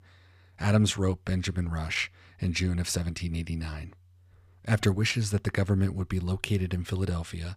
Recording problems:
none

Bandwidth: 15 kHz